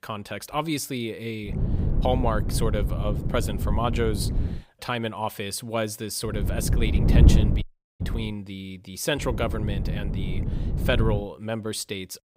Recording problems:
wind noise on the microphone; heavy; from 1.5 to 4.5 s, from 6.5 to 8.5 s and from 9 to 11 s; 7 dB below the speech
audio cutting out; at 7.5 s

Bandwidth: 15.5 kHz